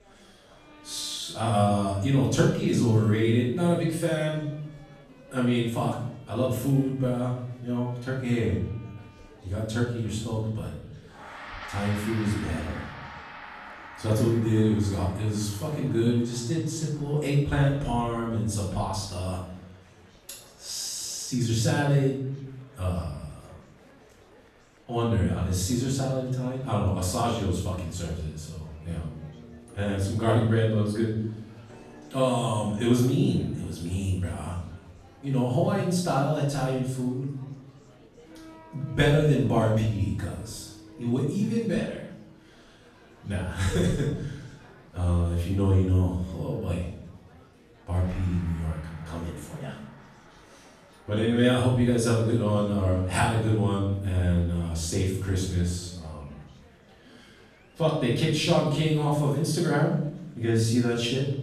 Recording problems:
off-mic speech; far
room echo; noticeable; dies away in 0.7 s
background music; faint; throughout; 20 dB below the speech
murmuring crowd; faint; throughout; 30 dB below the speech

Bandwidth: 14 kHz